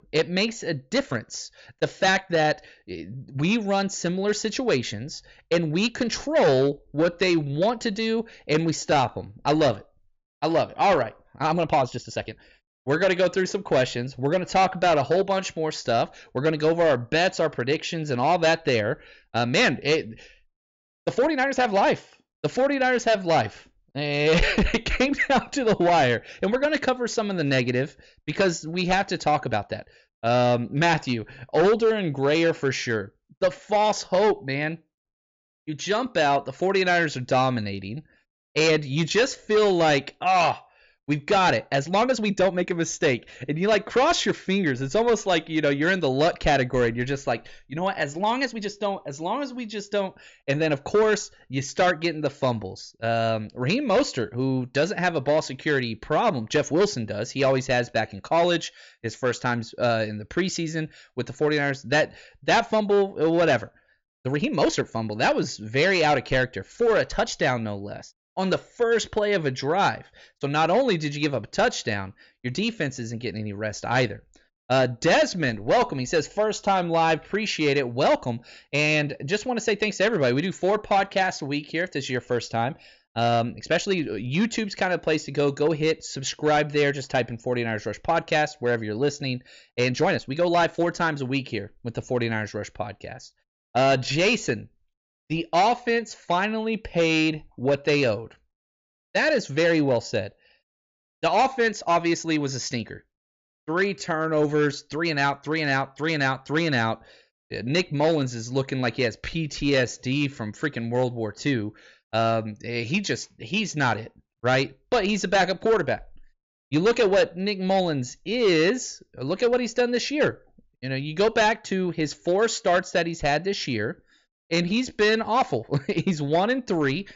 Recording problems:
high frequencies cut off; noticeable; nothing above 7.5 kHz
distortion; slight; 5% of the sound clipped
uneven, jittery; strongly; from 1 s to 2:05

